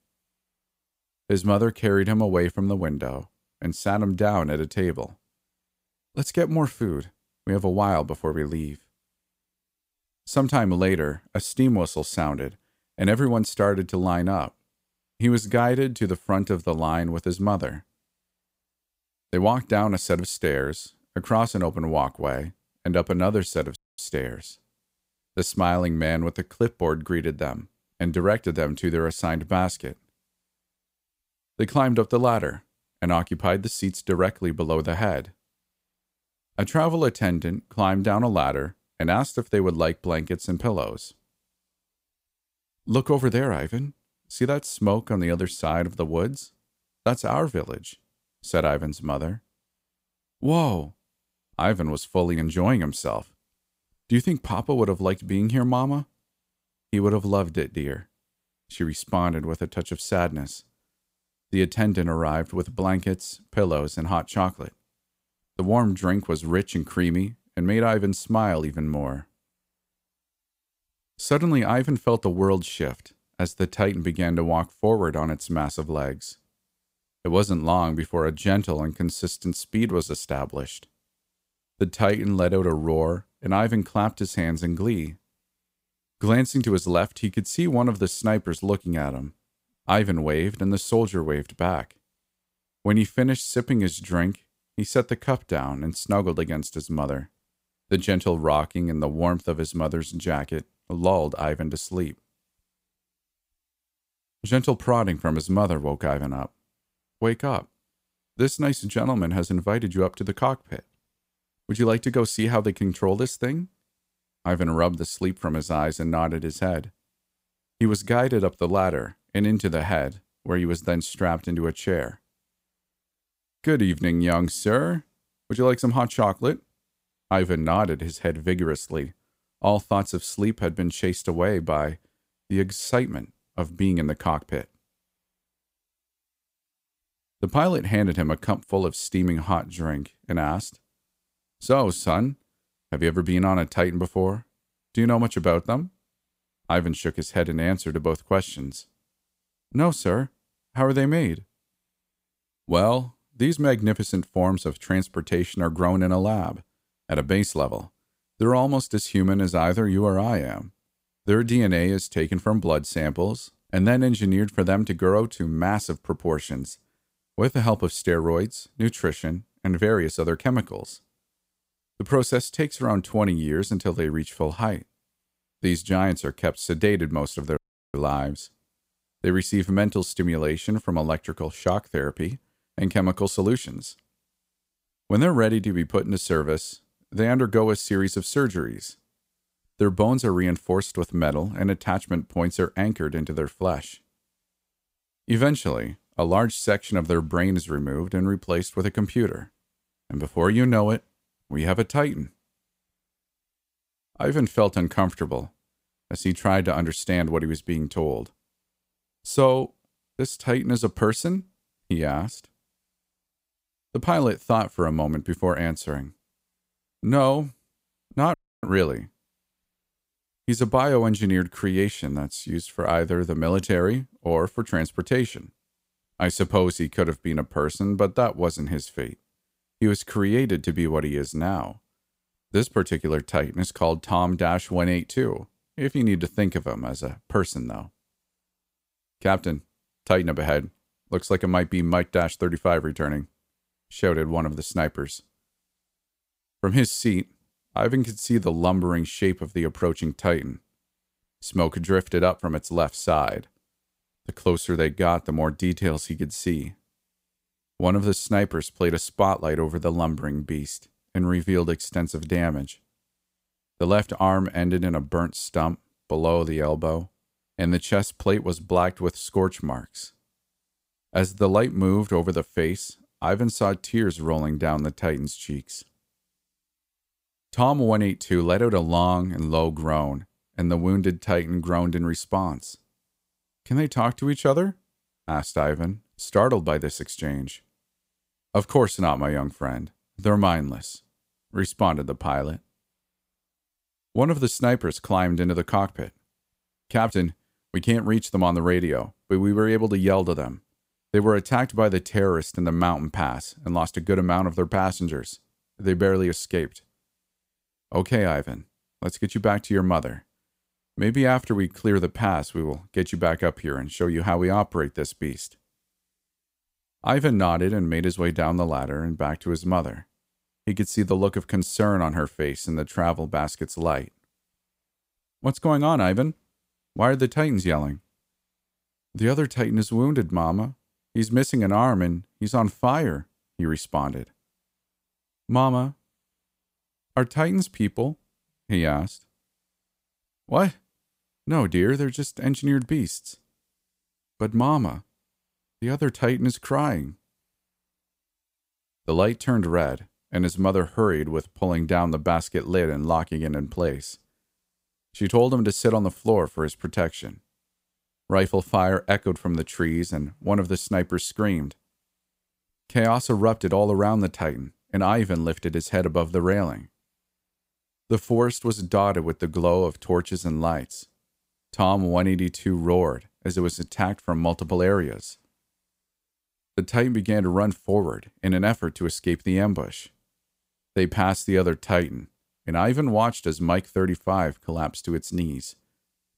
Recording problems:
audio cutting out; at 24 s, at 2:58 and at 3:38

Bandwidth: 15.5 kHz